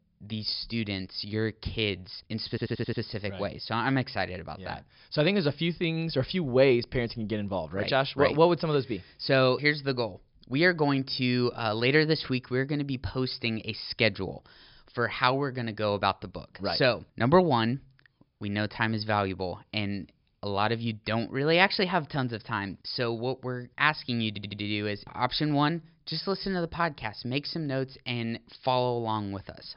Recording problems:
high frequencies cut off; noticeable; nothing above 5.5 kHz
audio stuttering; at 2.5 s and at 24 s

